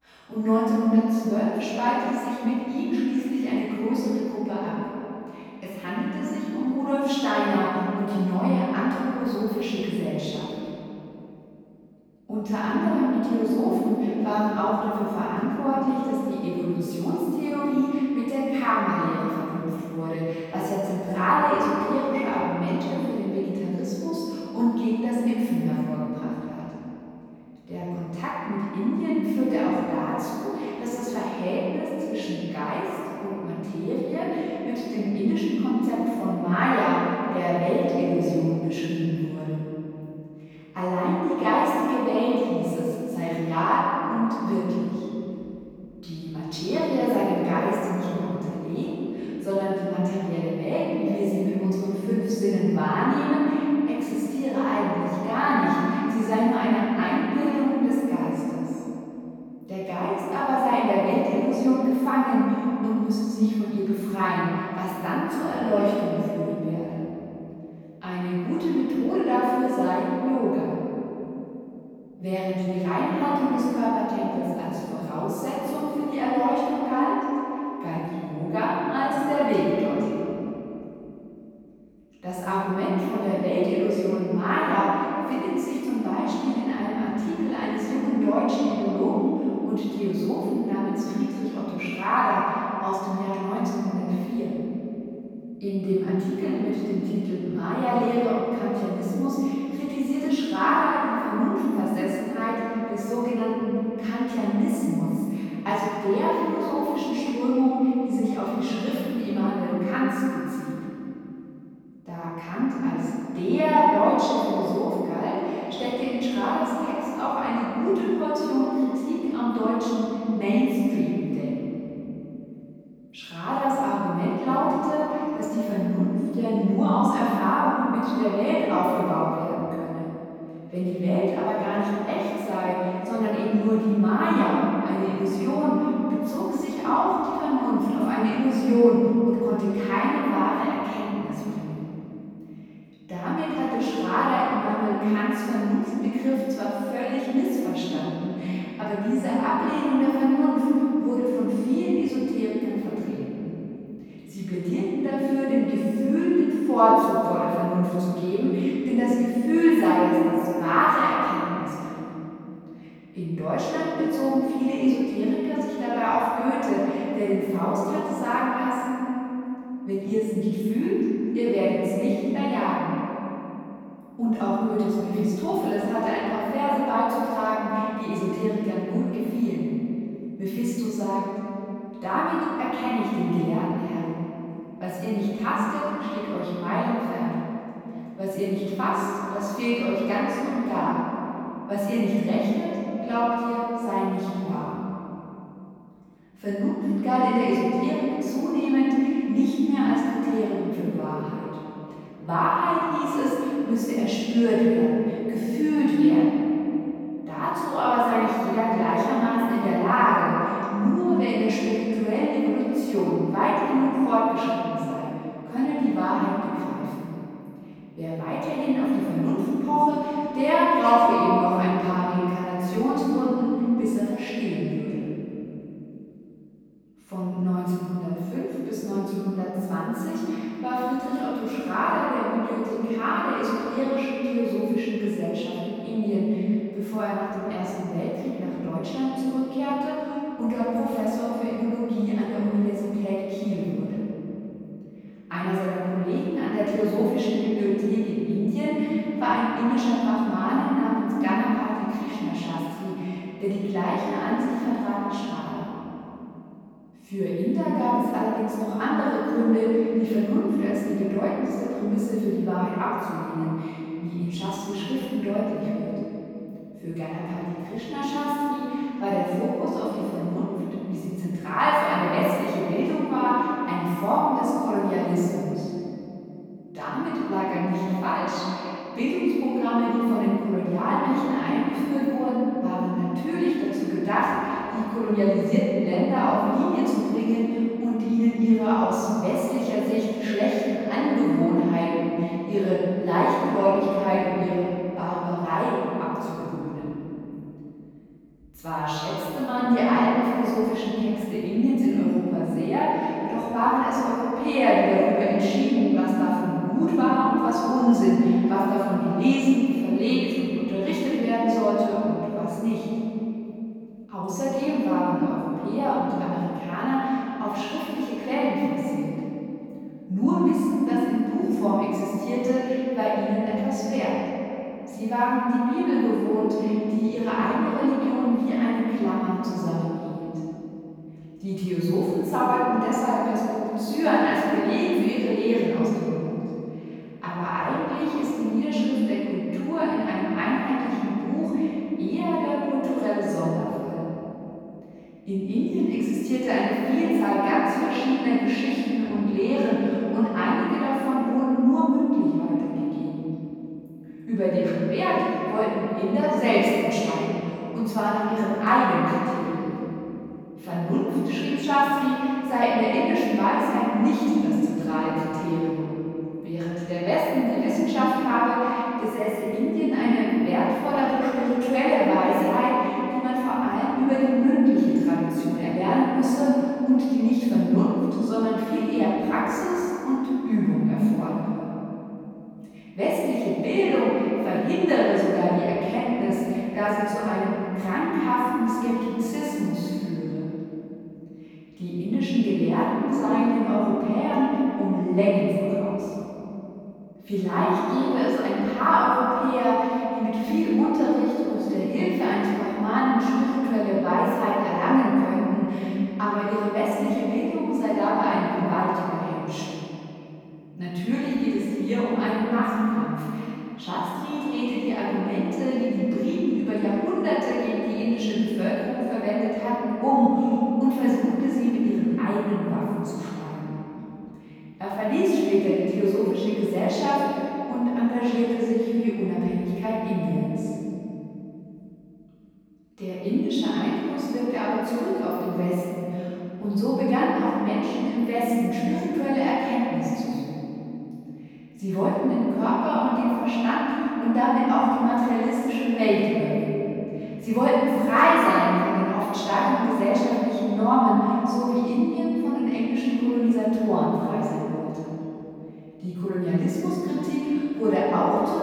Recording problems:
room echo; strong; dies away in 3 s
off-mic speech; far

